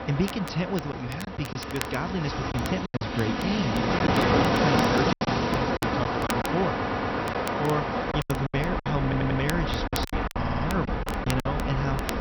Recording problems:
garbled, watery; slightly; nothing above 6 kHz
train or aircraft noise; very loud; throughout; 3 dB above the speech
crackle, like an old record; noticeable; 10 dB below the speech
choppy; very; from 1 to 3 s, from 4 to 7.5 s and from 8 to 11 s; 12% of the speech affected
audio stuttering; at 6.5 s, at 9 s and at 10 s

